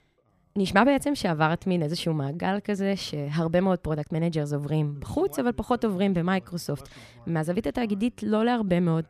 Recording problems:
voice in the background; faint; throughout; 25 dB below the speech

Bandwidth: 14.5 kHz